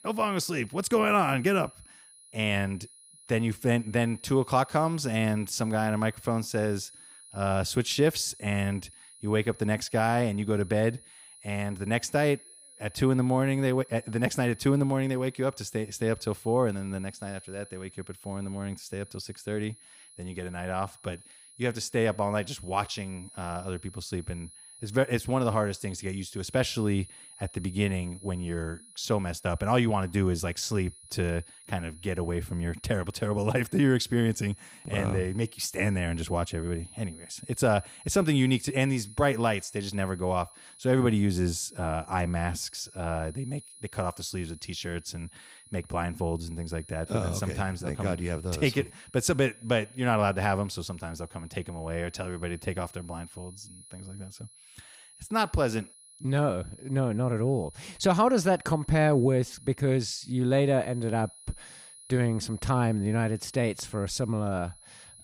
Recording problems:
high-pitched whine; faint; throughout; 10.5 kHz, 20 dB below the speech

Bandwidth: 15.5 kHz